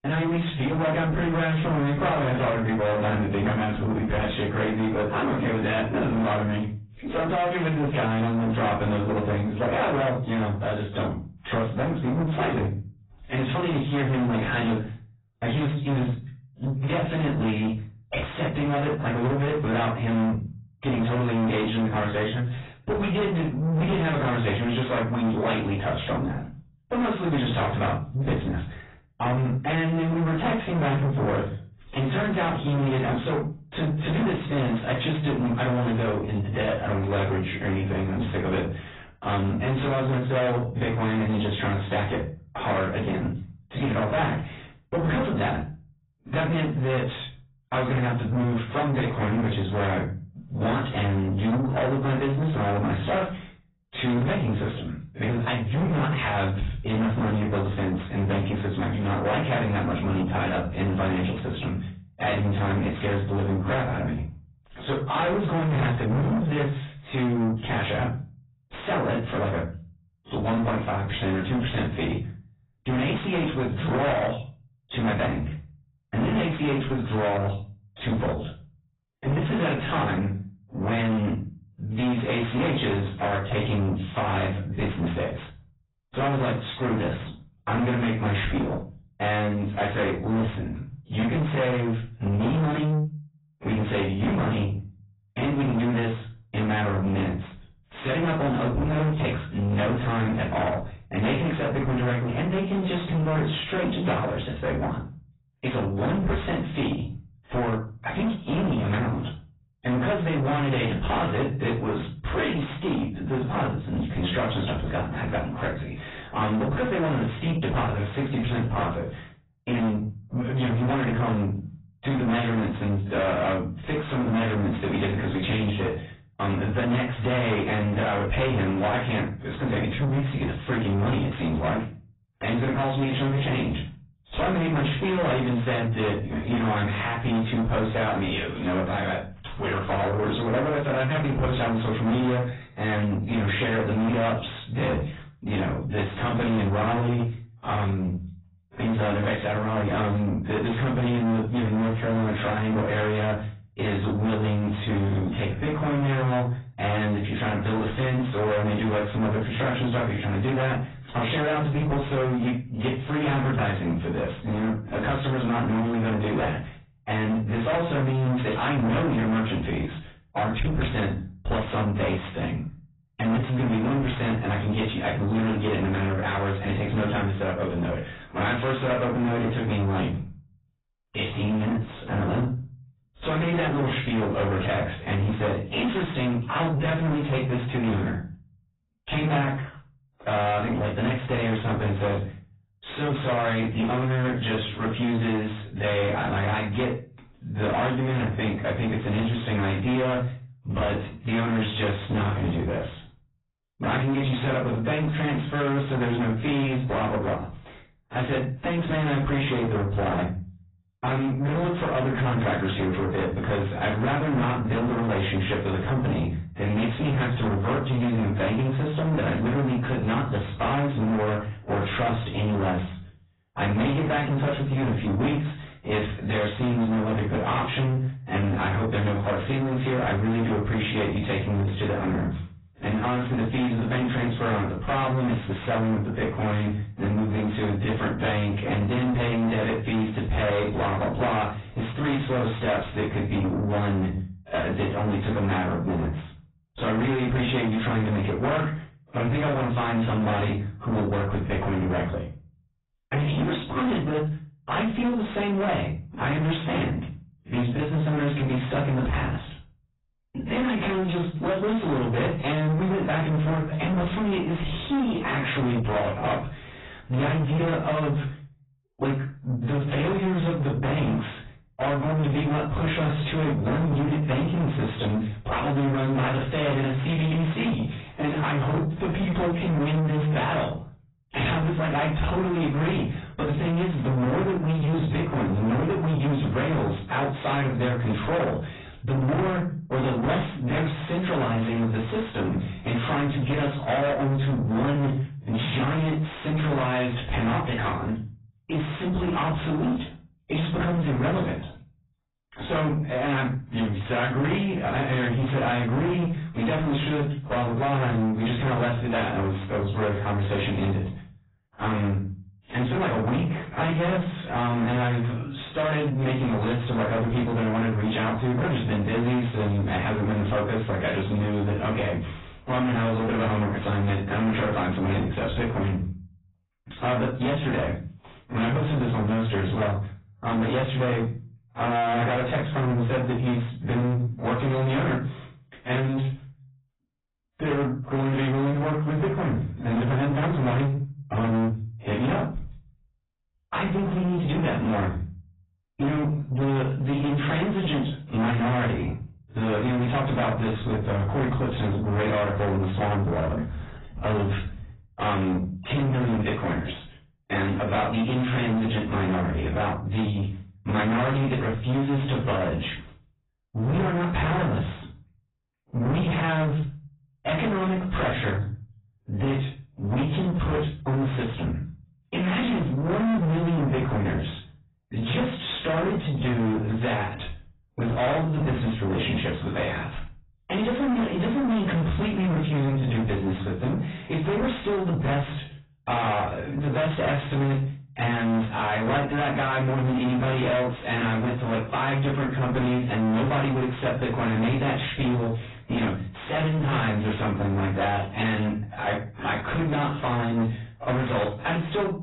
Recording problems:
distortion; heavy; 7 dB below the speech
off-mic speech; far
garbled, watery; badly; nothing above 4 kHz
room echo; slight; dies away in 0.3 s

